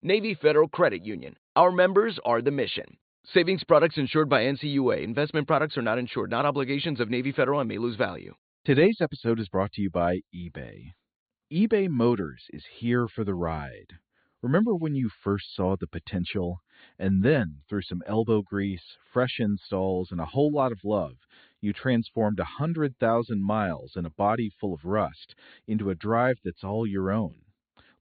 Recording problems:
high frequencies cut off; severe; nothing above 4.5 kHz

